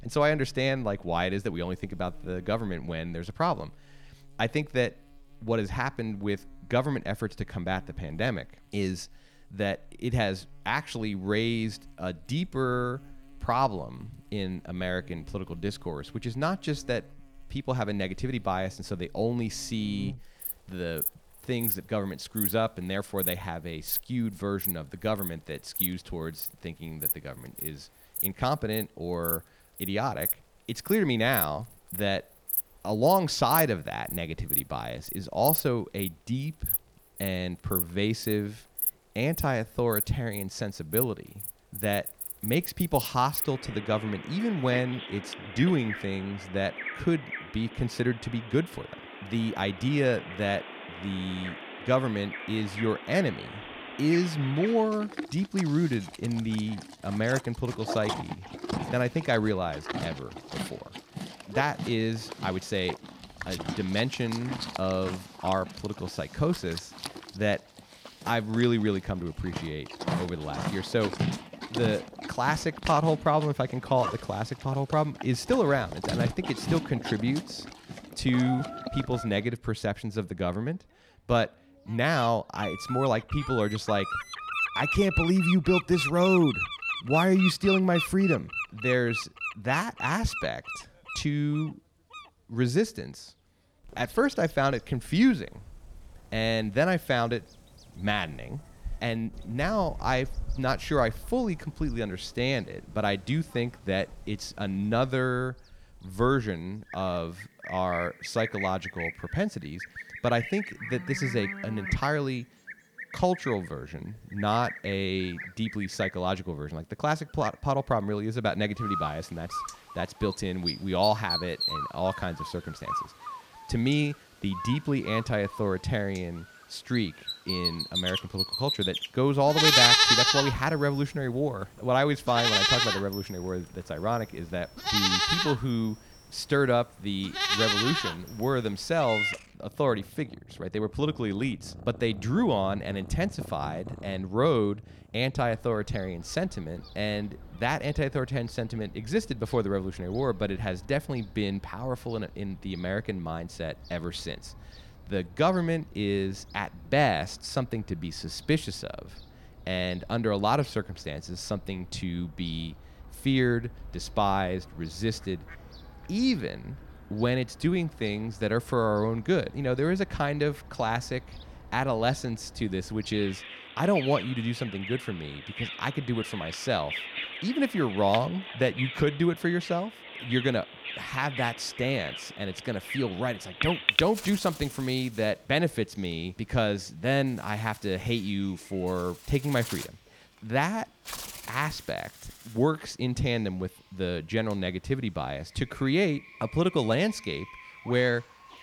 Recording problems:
animal sounds; loud; throughout; 3 dB below the speech

